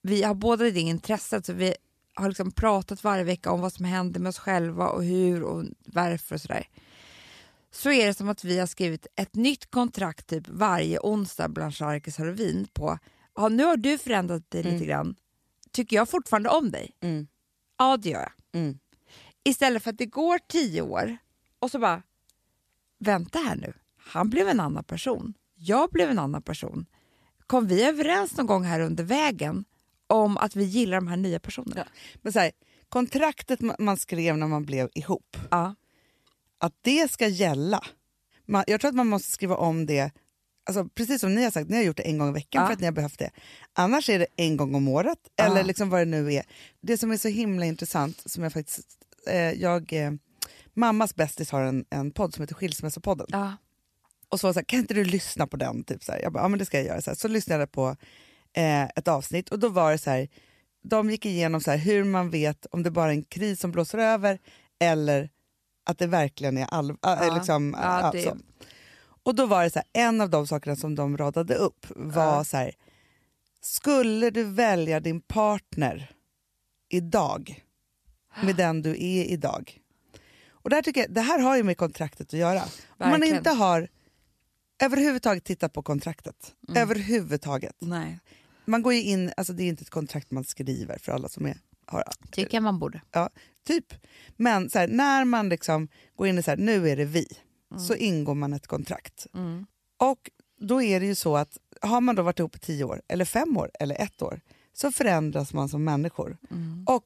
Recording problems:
none

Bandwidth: 14 kHz